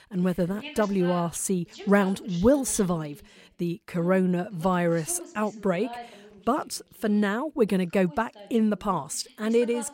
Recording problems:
voice in the background; noticeable; throughout; 20 dB below the speech

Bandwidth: 16 kHz